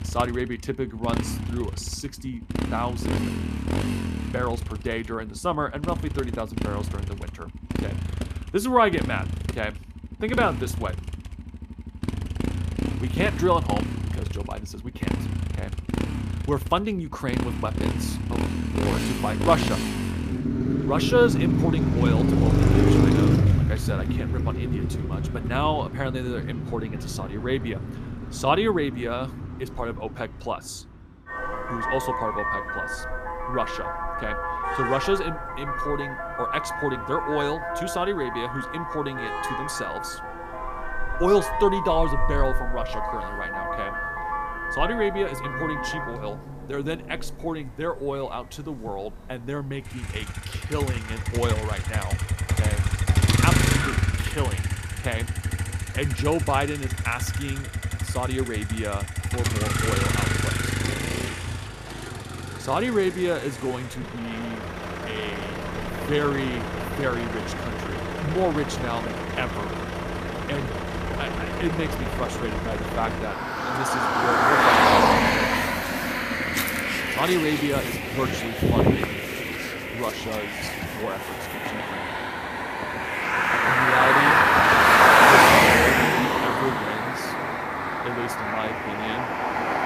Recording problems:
traffic noise; very loud; throughout; 5 dB above the speech

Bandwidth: 14.5 kHz